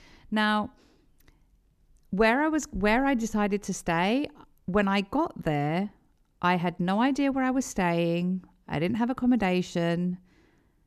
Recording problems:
none

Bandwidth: 14.5 kHz